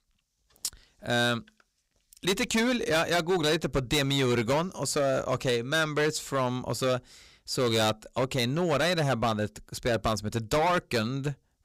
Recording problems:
distortion; heavy; 11% of the sound clipped

